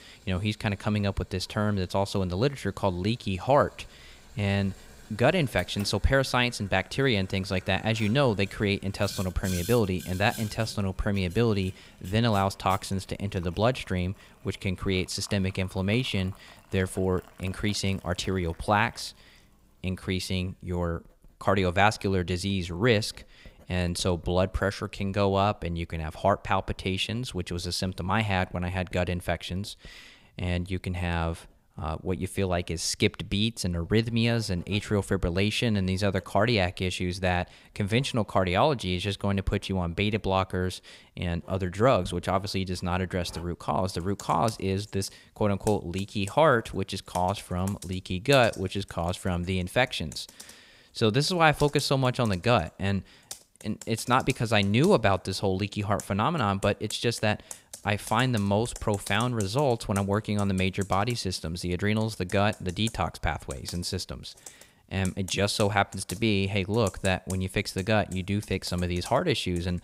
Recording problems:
household noises; noticeable; throughout; 20 dB below the speech

